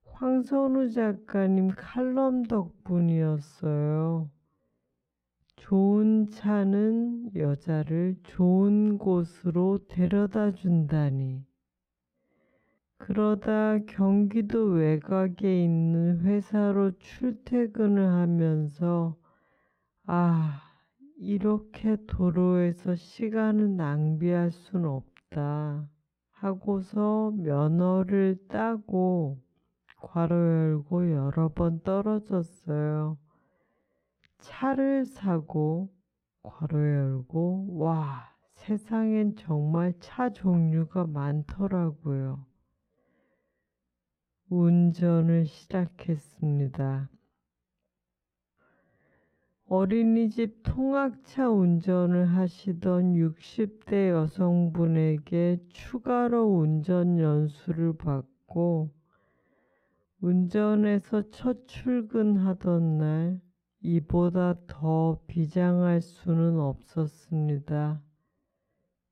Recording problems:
wrong speed, natural pitch; too slow; 0.5 times normal speed
muffled; slightly; fading above 3 kHz

